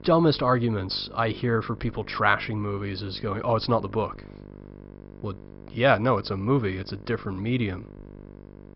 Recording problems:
high frequencies cut off; noticeable; nothing above 5.5 kHz
electrical hum; faint; throughout; 50 Hz, 25 dB below the speech

